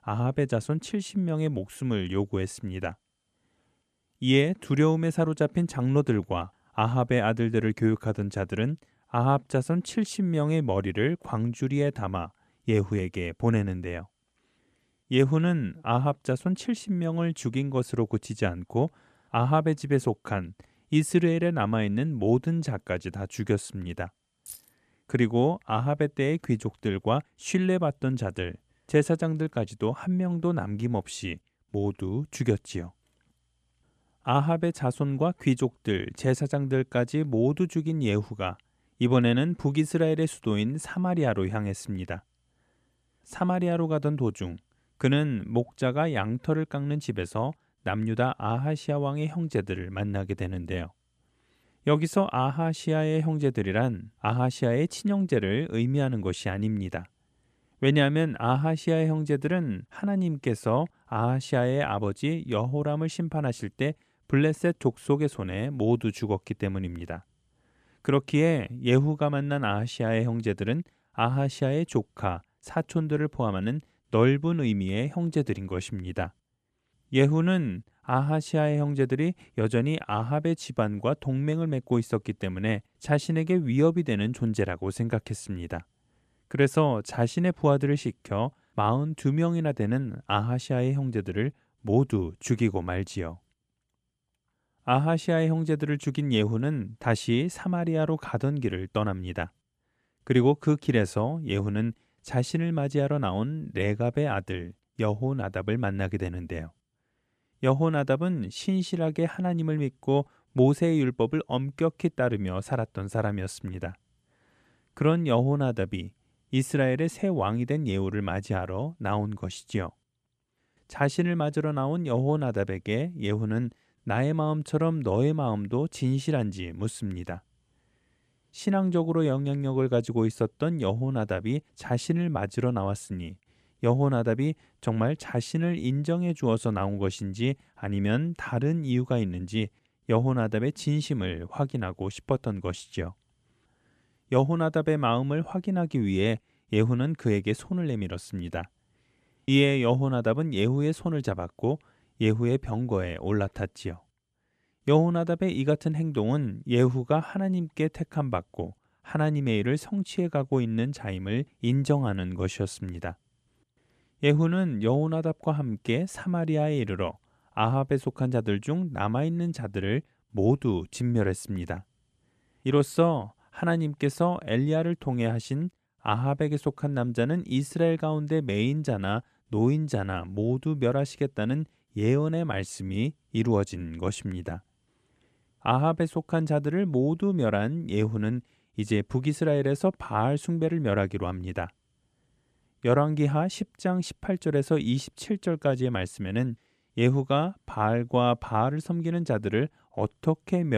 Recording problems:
jangling keys; faint; at 24 s; peak 15 dB below the speech
abrupt cut into speech; at the end

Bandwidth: 13.5 kHz